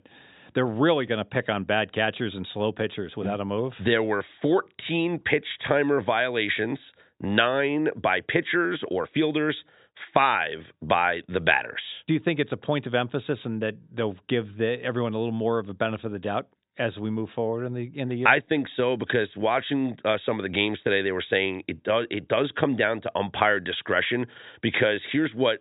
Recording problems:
high frequencies cut off; severe; nothing above 4 kHz

